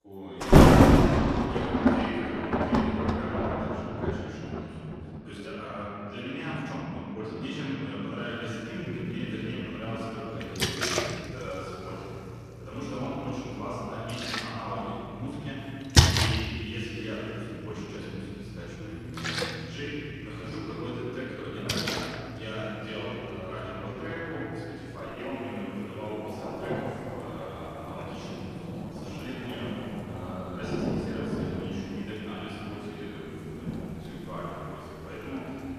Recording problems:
room echo; strong; dies away in 3 s
off-mic speech; far
rain or running water; very loud; throughout; 10 dB above the speech
uneven, jittery; strongly; from 5 to 31 s

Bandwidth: 14.5 kHz